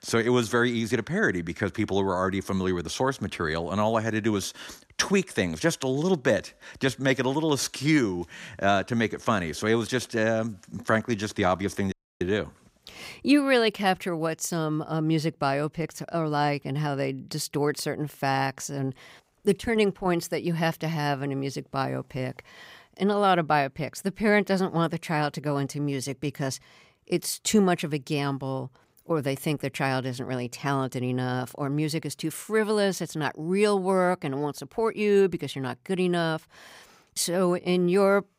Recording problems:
audio cutting out; at 12 s

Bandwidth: 15.5 kHz